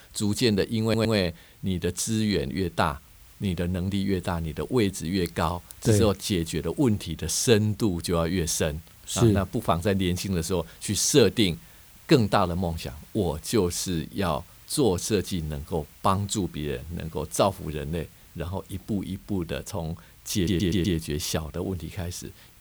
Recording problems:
hiss; faint; throughout; 25 dB below the speech
audio stuttering; at 1 s and at 20 s

